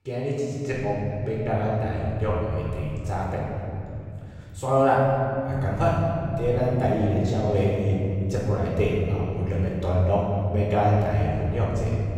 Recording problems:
room echo; strong; dies away in 3 s
off-mic speech; far

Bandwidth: 16 kHz